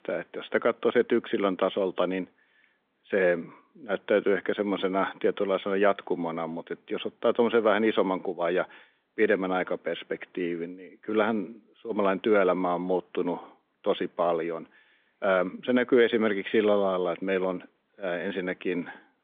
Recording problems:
phone-call audio; nothing above 3.5 kHz

